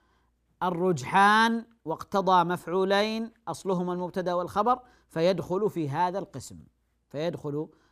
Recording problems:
none

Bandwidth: 15 kHz